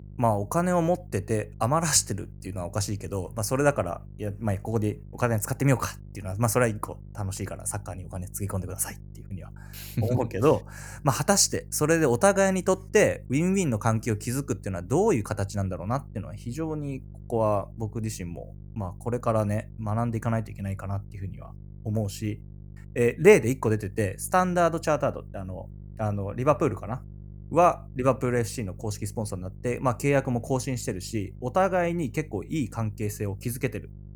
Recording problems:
electrical hum; faint; throughout; 50 Hz, 30 dB below the speech

